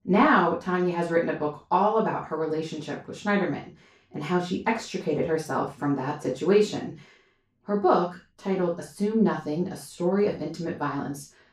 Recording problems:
off-mic speech; far
room echo; noticeable; dies away in 0.2 s

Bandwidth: 15.5 kHz